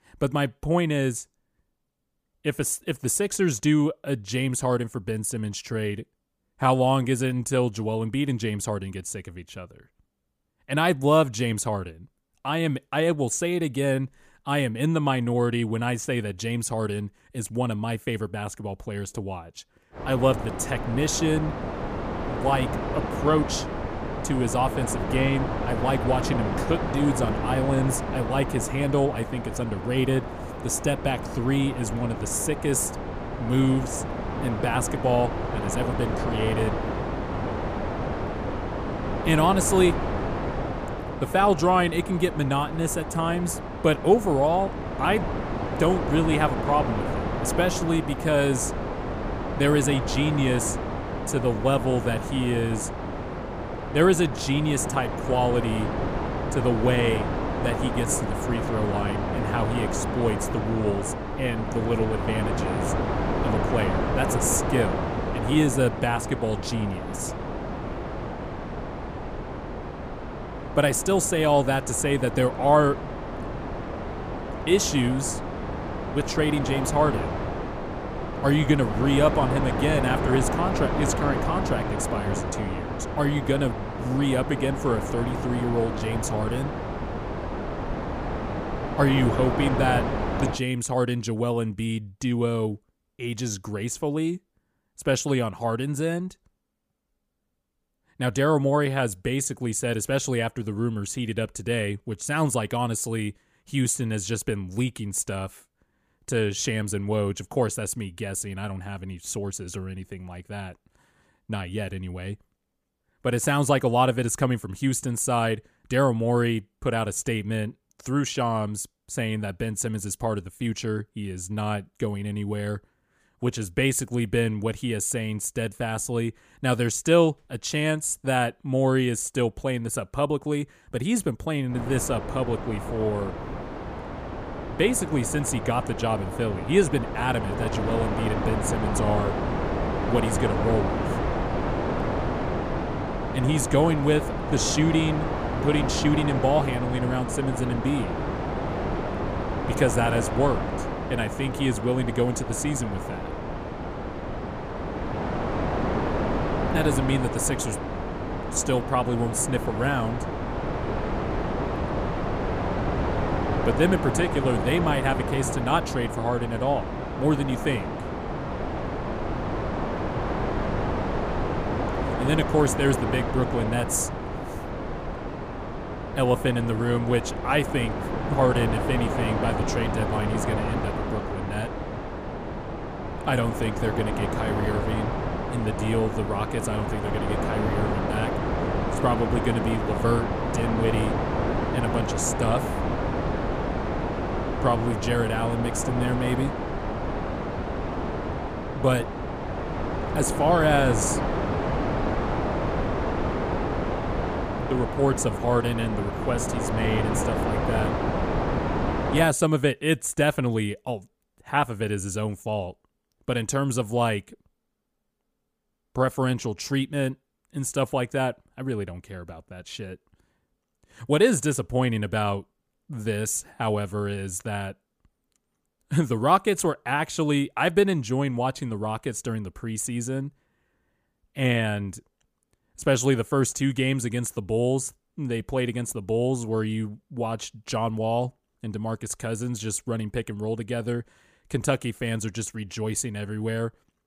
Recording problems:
wind noise on the microphone; heavy; from 20 s to 1:31 and from 2:12 to 3:29; 3 dB below the speech

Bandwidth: 15 kHz